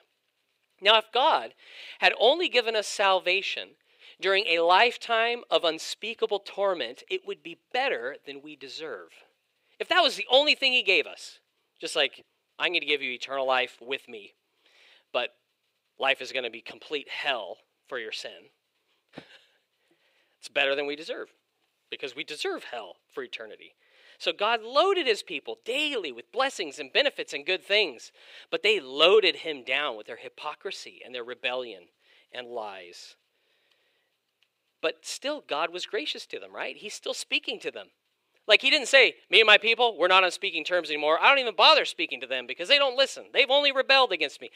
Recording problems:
thin; somewhat; fading below 450 Hz

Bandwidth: 15.5 kHz